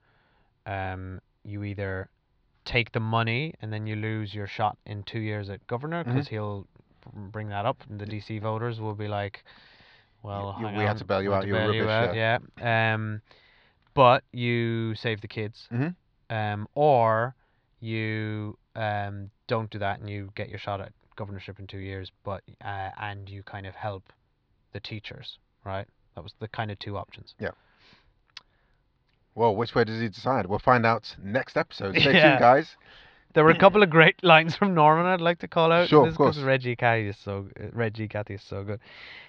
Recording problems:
muffled; slightly; fading above 4.5 kHz

